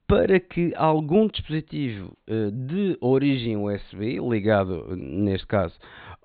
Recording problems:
high frequencies cut off; severe; nothing above 4 kHz

